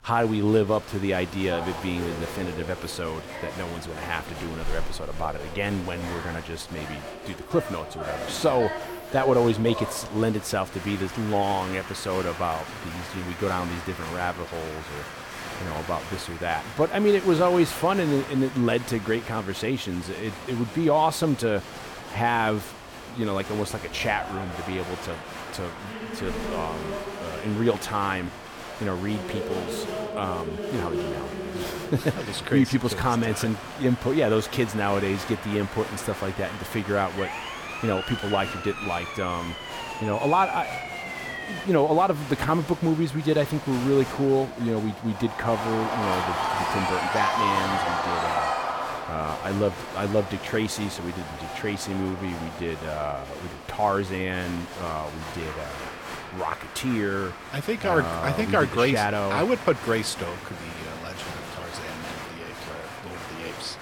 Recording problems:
crowd noise; loud; throughout; 7 dB below the speech
siren; noticeable; from 37 to 42 s; peak 5 dB below the speech

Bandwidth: 17.5 kHz